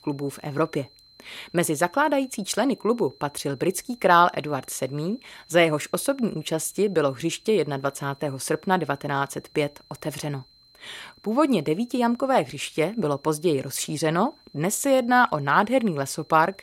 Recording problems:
high-pitched whine; faint; throughout; 4 kHz, 30 dB below the speech

